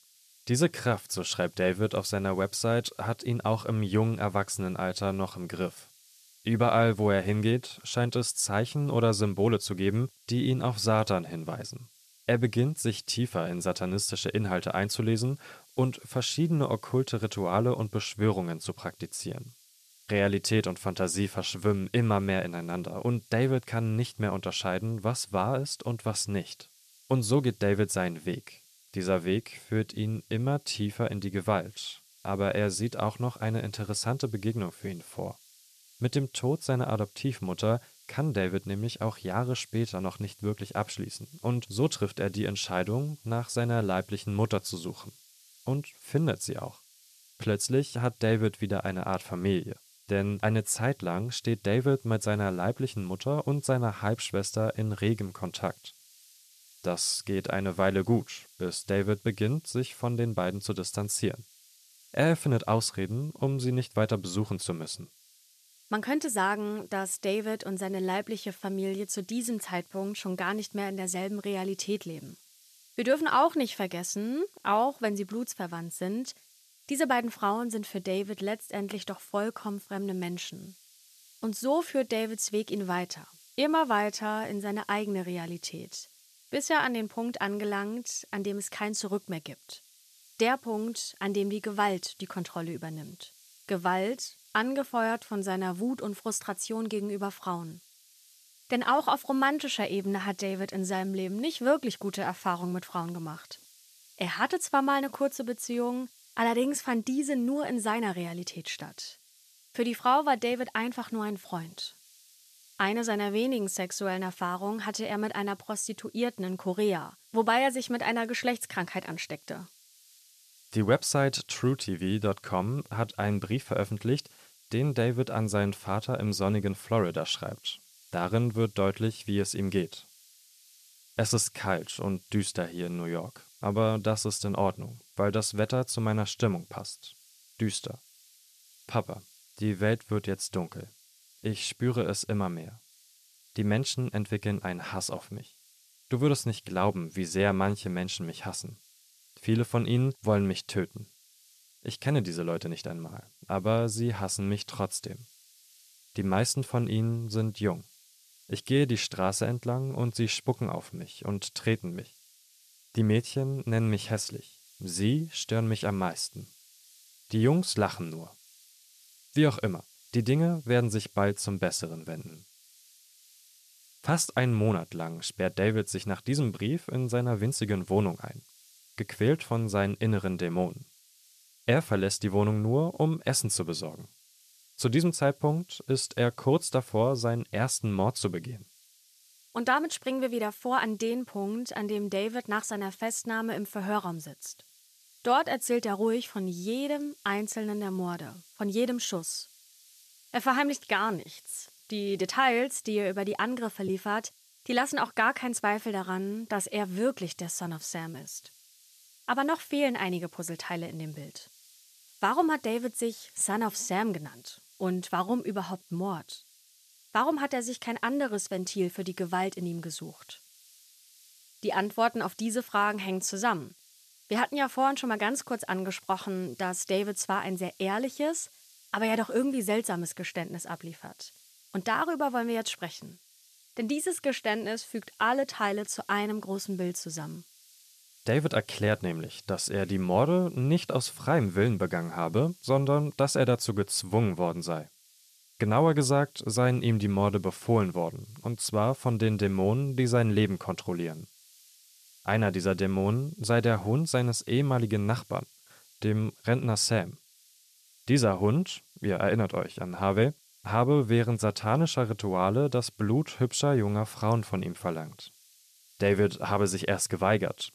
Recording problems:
hiss; faint; throughout; 25 dB below the speech

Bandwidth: 14 kHz